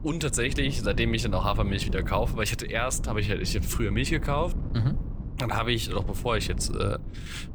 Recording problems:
wind noise on the microphone; occasional gusts; 15 dB below the speech

